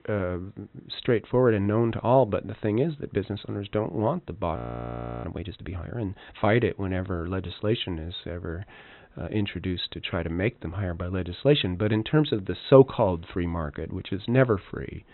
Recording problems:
high frequencies cut off; severe; nothing above 4 kHz
audio freezing; at 4.5 s for 0.5 s

